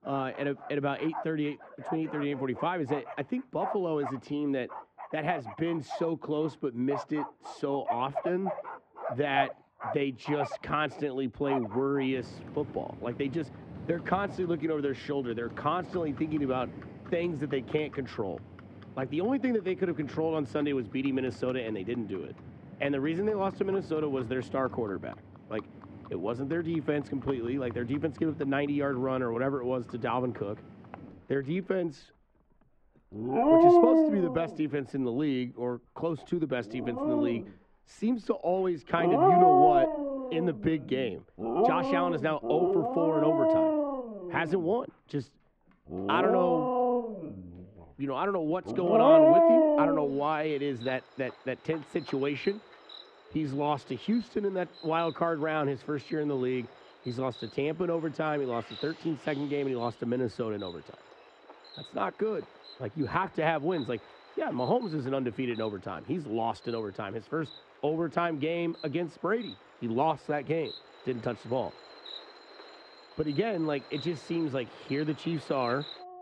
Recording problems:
muffled; very; fading above 2 kHz
animal sounds; very loud; throughout; 4 dB above the speech

